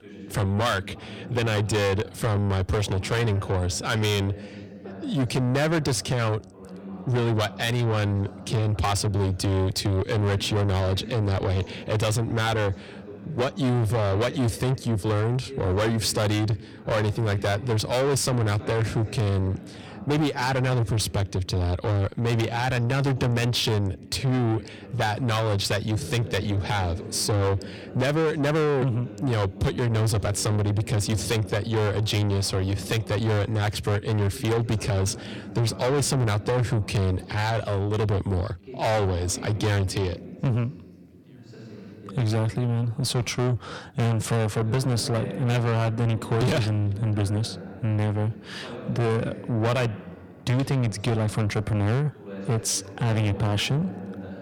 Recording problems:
distortion; heavy; 6 dB below the speech
voice in the background; noticeable; throughout; 15 dB below the speech

